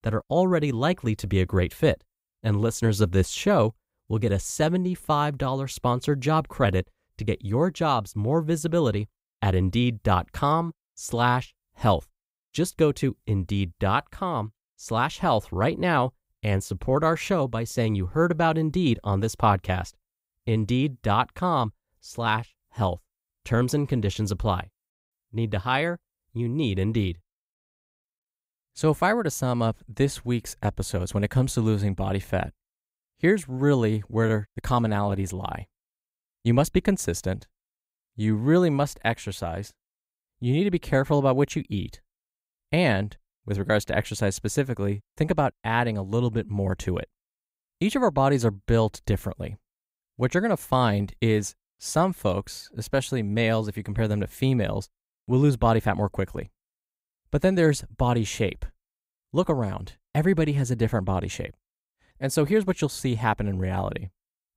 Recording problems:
none

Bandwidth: 15.5 kHz